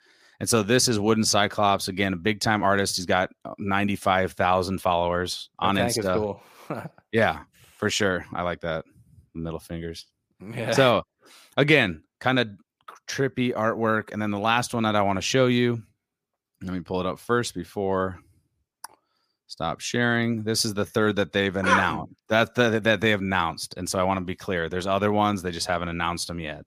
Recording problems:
none

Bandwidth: 15 kHz